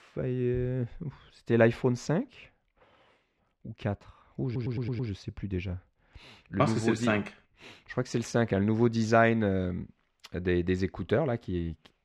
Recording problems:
muffled; slightly; fading above 3 kHz
audio stuttering; at 4.5 s

